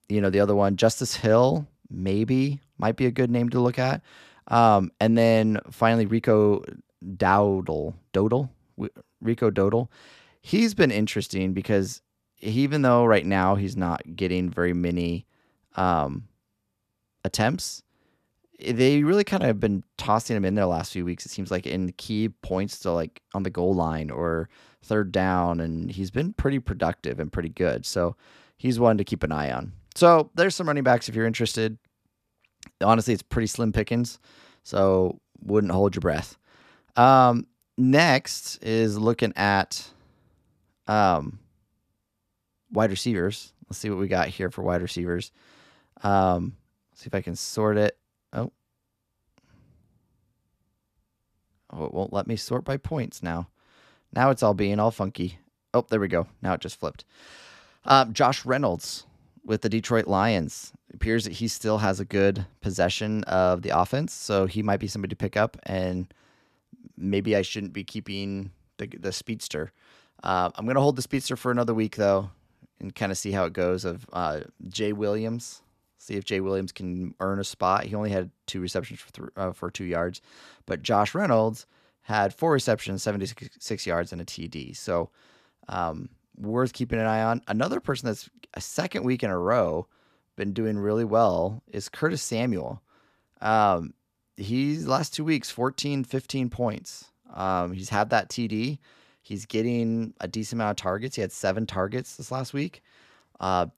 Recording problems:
none

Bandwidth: 14.5 kHz